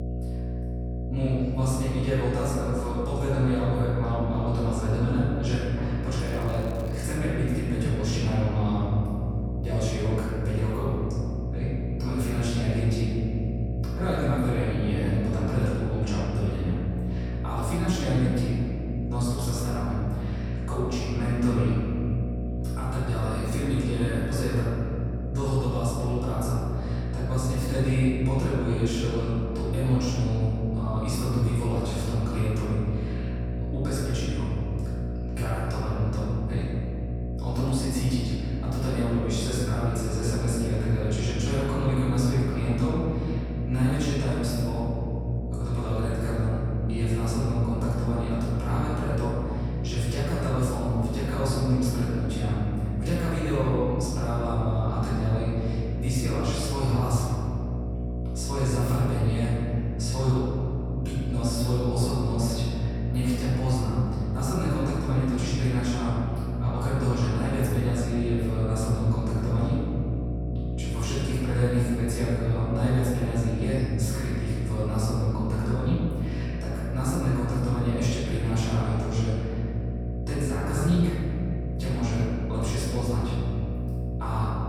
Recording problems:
room echo; strong; dies away in 2.4 s
off-mic speech; far
electrical hum; loud; throughout; 60 Hz, 8 dB below the speech
crackling; faint; at 6.5 s; 25 dB below the speech

